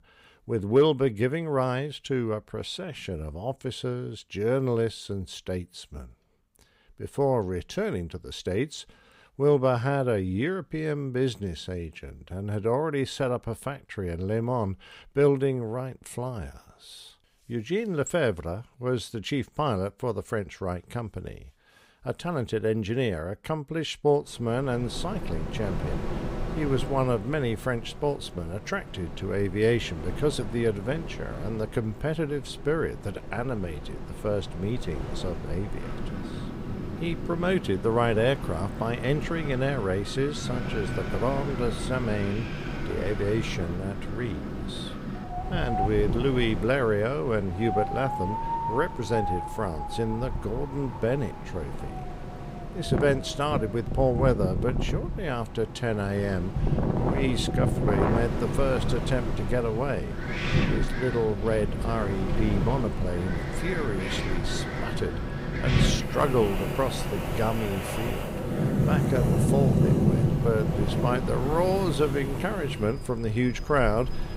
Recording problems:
wind in the background; loud; from 25 s on; 2 dB below the speech

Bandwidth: 15.5 kHz